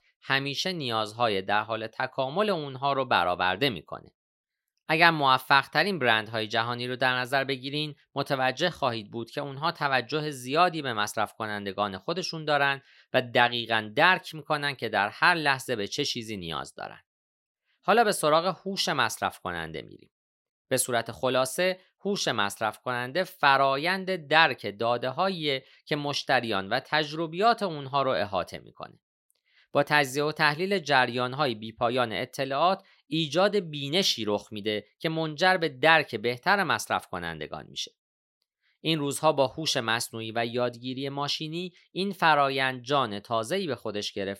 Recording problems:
none

